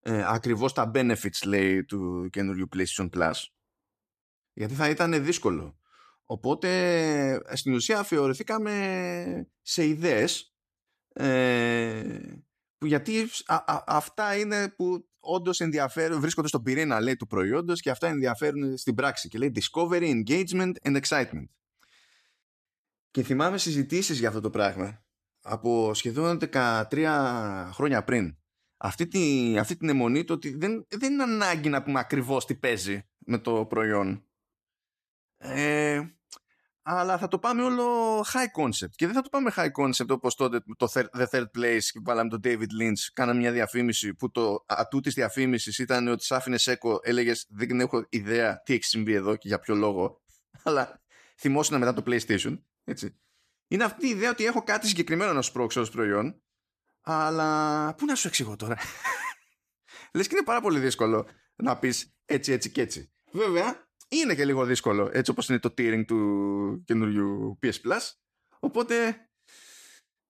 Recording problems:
none

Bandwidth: 14.5 kHz